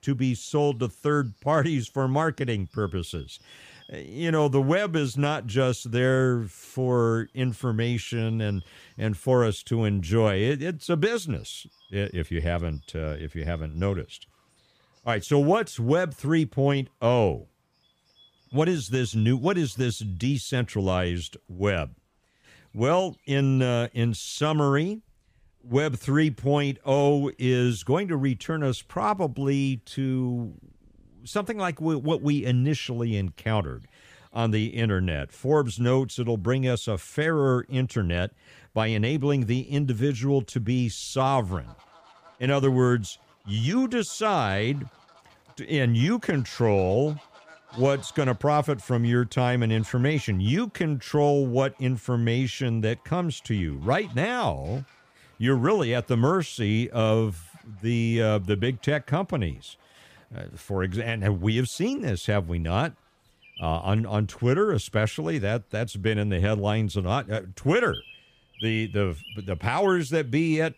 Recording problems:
animal sounds; faint; throughout; 25 dB below the speech

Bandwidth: 15 kHz